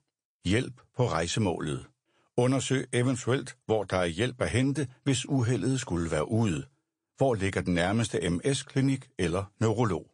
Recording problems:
garbled, watery; slightly; nothing above 9 kHz

